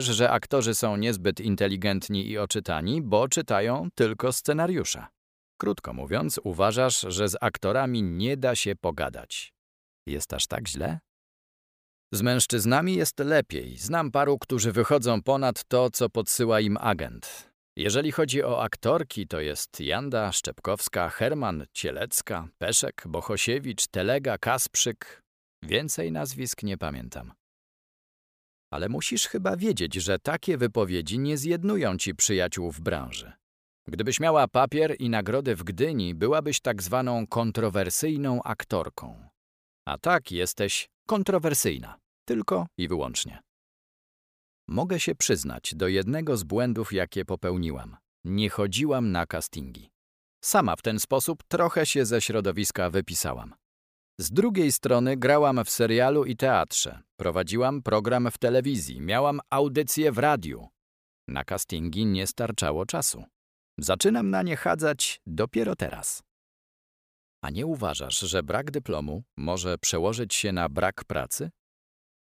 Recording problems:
abrupt cut into speech; at the start

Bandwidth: 15 kHz